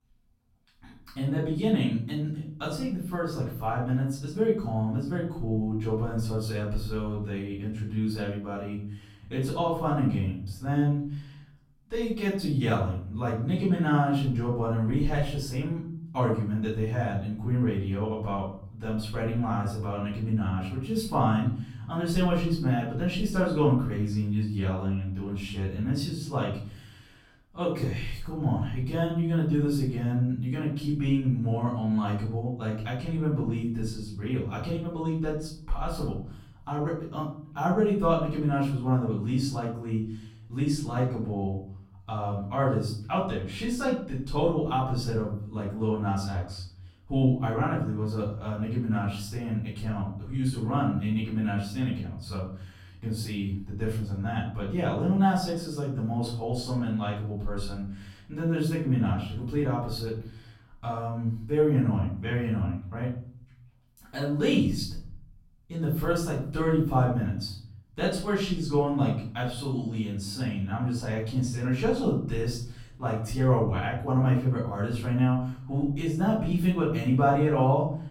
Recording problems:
off-mic speech; far
room echo; noticeable; dies away in 0.7 s

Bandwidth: 16.5 kHz